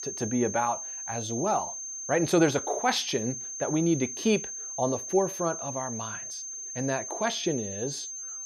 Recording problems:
high-pitched whine; loud; throughout; 6.5 kHz, 6 dB below the speech

